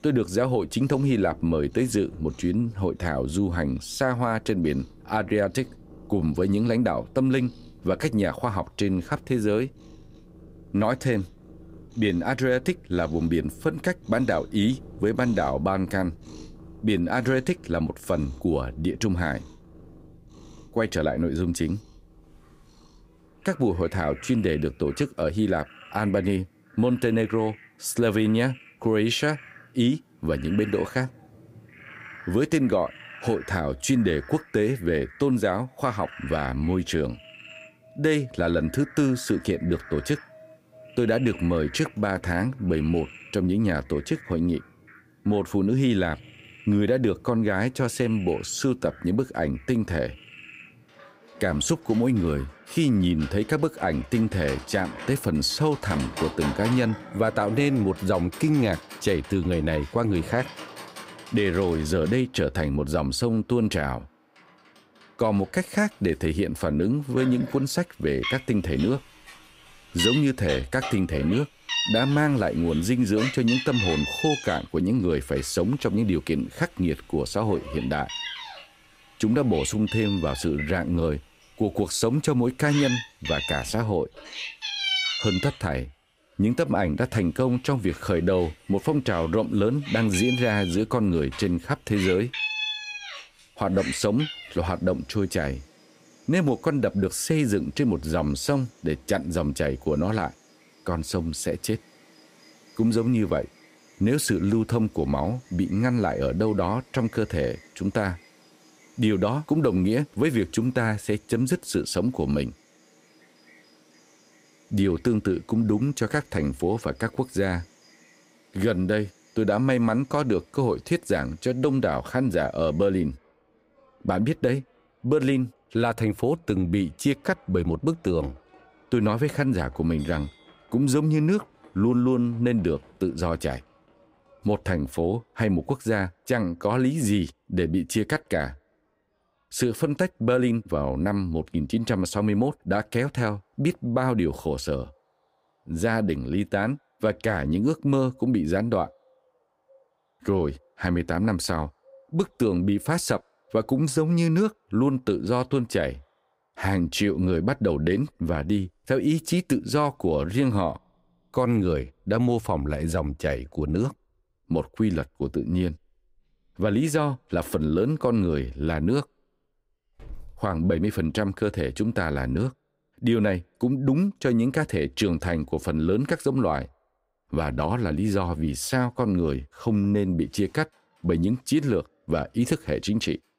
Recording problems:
animal sounds; noticeable; throughout; 10 dB below the speech

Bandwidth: 15.5 kHz